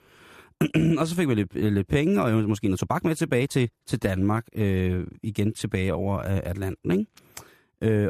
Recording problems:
uneven, jittery; strongly; from 0.5 to 6 s
abrupt cut into speech; at the end

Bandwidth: 14.5 kHz